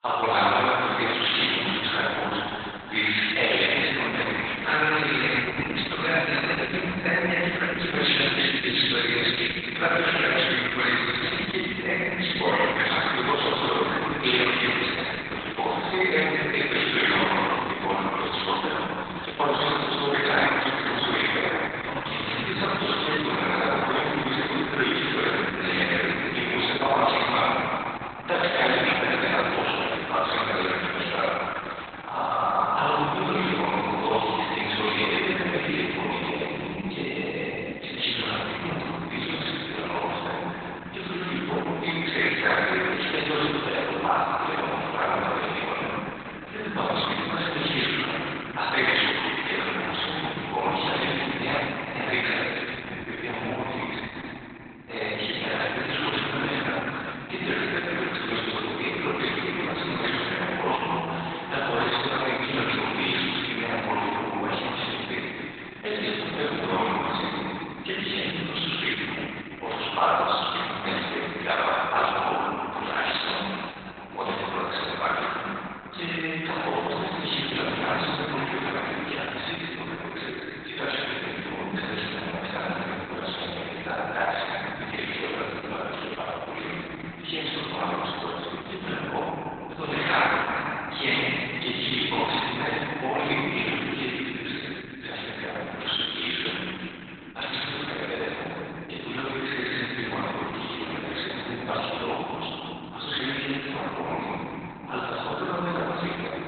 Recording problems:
room echo; strong; dies away in 3 s
off-mic speech; far
garbled, watery; badly; nothing above 4 kHz
thin; very; fading below 650 Hz

